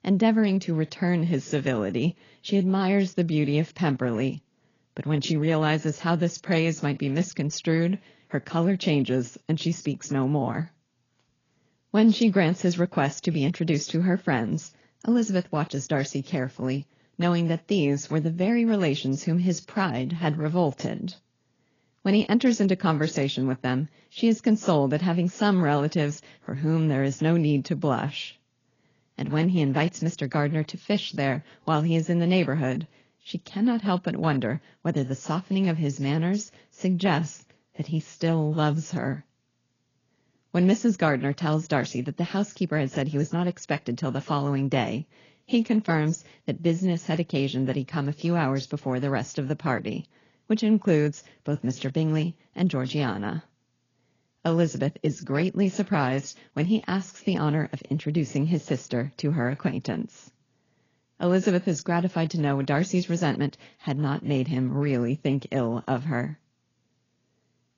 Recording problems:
garbled, watery; badly
high frequencies cut off; noticeable; nothing above 7 kHz

